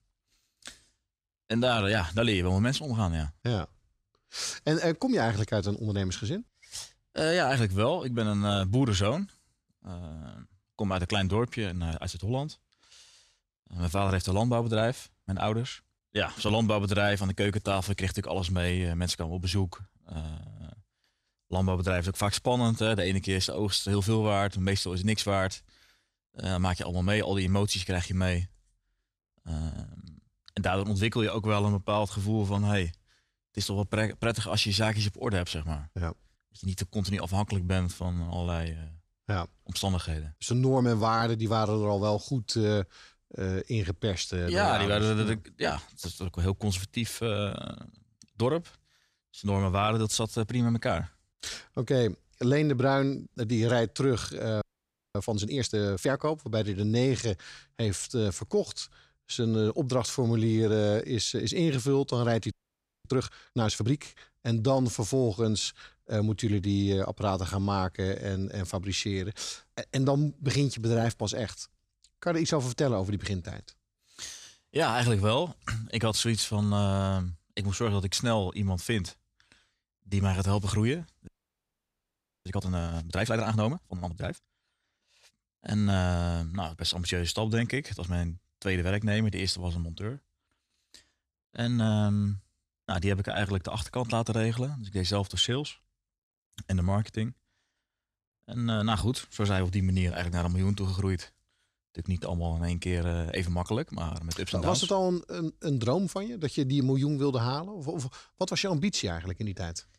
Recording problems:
audio freezing; at 55 s for 0.5 s, at 1:03 for 0.5 s and at 1:21 for 1 s

